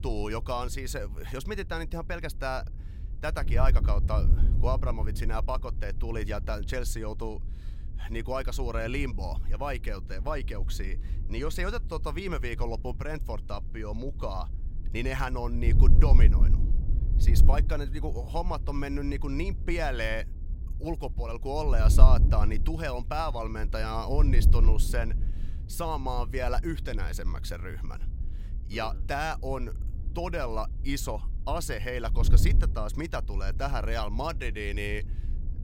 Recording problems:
wind noise on the microphone; occasional gusts; 15 dB below the speech

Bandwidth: 16 kHz